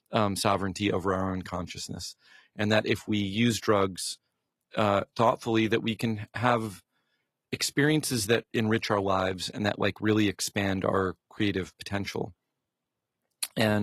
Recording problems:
garbled, watery; slightly; nothing above 12.5 kHz
abrupt cut into speech; at the end

